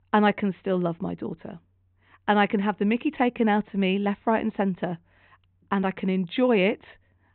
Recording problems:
high frequencies cut off; severe; nothing above 4 kHz
muffled; very slightly; fading above 3 kHz

